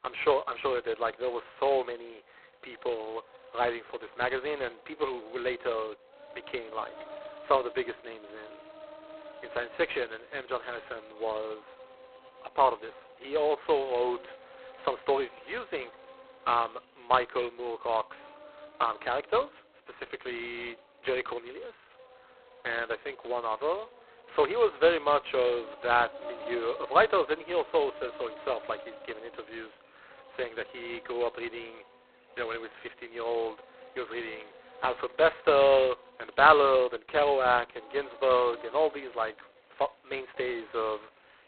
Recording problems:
phone-call audio; poor line; nothing above 4 kHz
animal sounds; faint; throughout; 20 dB below the speech

